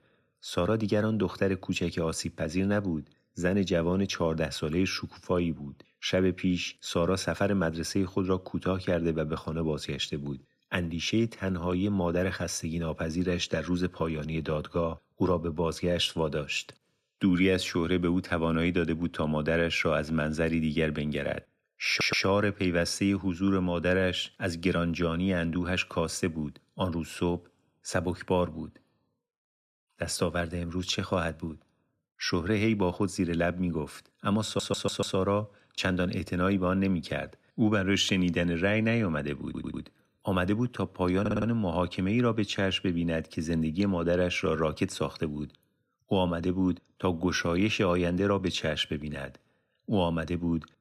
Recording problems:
audio stuttering; 4 times, first at 22 s

